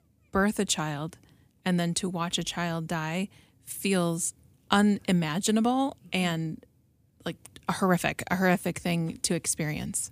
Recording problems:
none

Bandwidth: 15 kHz